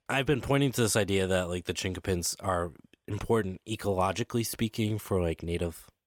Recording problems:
none

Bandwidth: 18 kHz